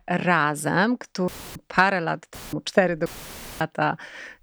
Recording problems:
audio cutting out; filled with static; at 1.5 s, at 2.5 s and at 3 s for 0.5 s

